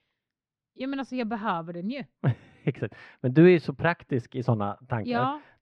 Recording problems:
muffled; slightly; fading above 2.5 kHz

